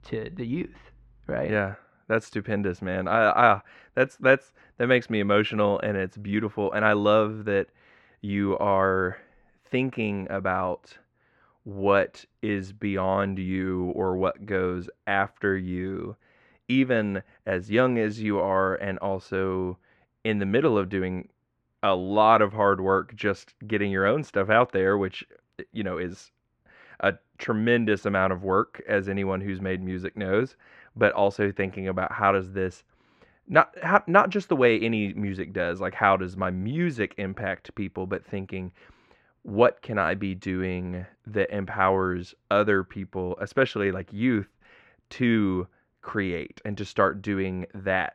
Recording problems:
muffled; very; fading above 2 kHz

